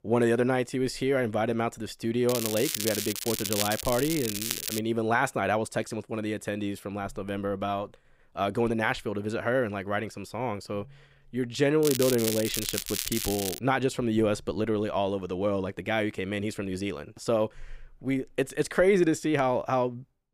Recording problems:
crackling; loud; from 2.5 to 5 s and from 12 to 14 s; 3 dB below the speech

